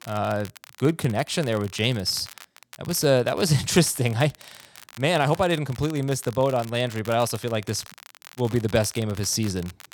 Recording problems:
crackle, like an old record; faint; 20 dB below the speech

